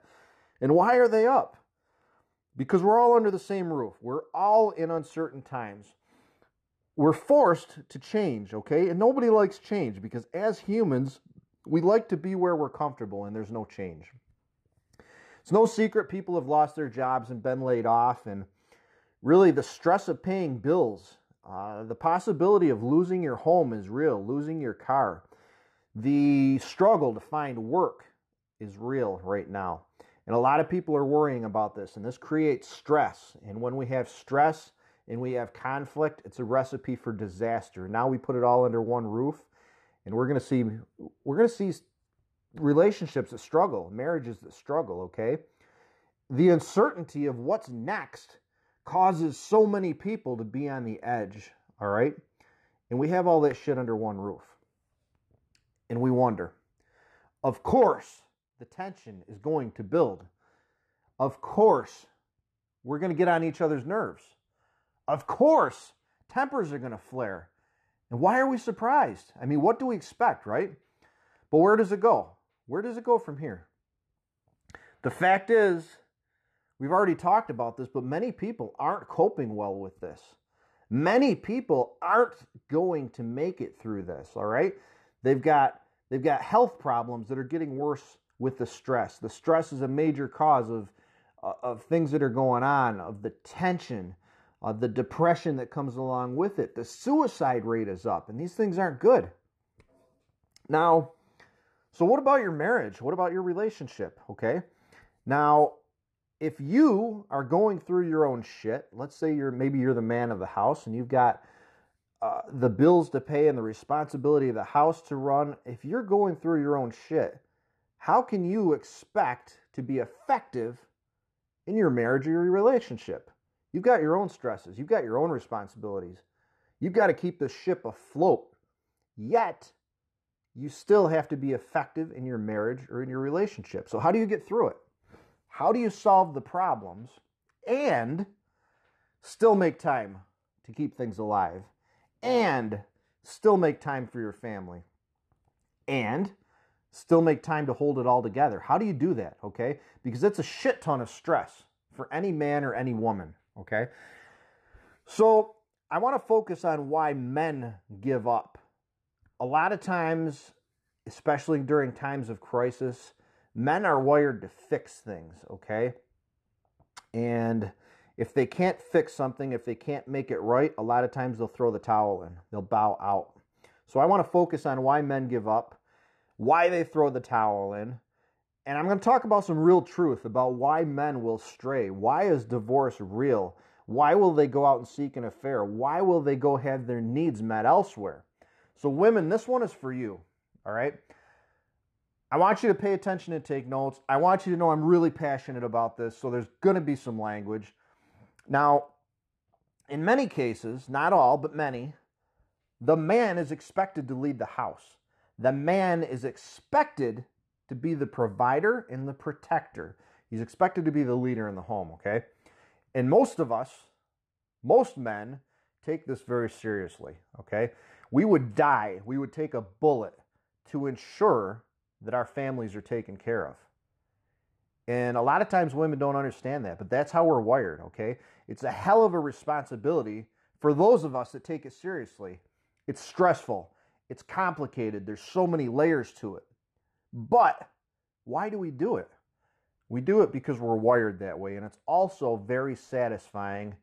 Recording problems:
muffled; very; fading above 3.5 kHz

